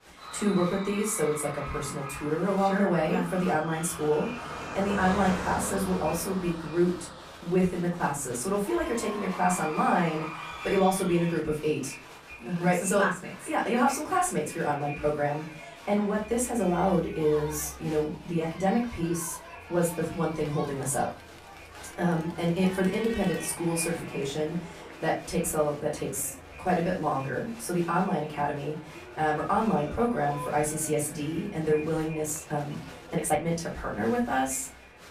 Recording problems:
off-mic speech; far
echo of what is said; faint; throughout; 390 ms later, 20 dB below the speech
room echo; slight; dies away in 0.3 s
crowd noise; noticeable; throughout; 15 dB below the speech
traffic noise; noticeable; throughout; 15 dB below the speech
uneven, jittery; strongly; from 7.5 to 33 s

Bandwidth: 14.5 kHz